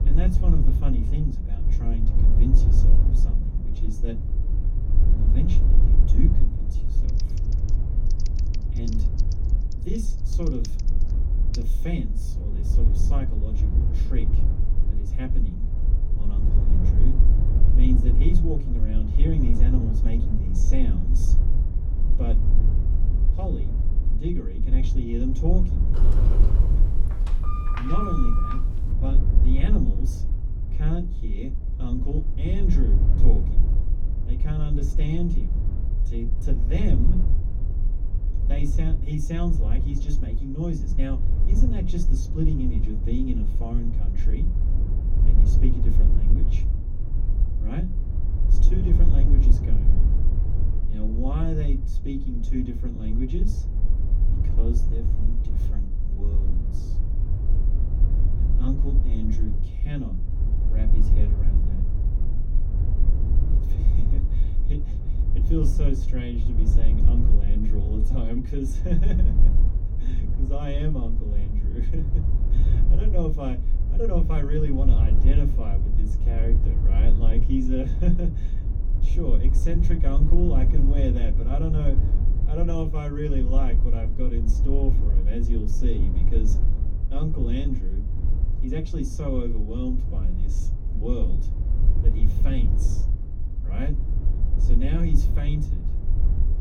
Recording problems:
off-mic speech; far
room echo; slight; dies away in 0.3 s
low rumble; loud; throughout; 6 dB below the speech
electrical hum; faint; throughout; 50 Hz, 30 dB below the speech
keyboard typing; faint; from 7 to 12 s; peak 10 dB below the speech
door banging; loud; from 26 to 29 s; peak level with the speech

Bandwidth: 17.5 kHz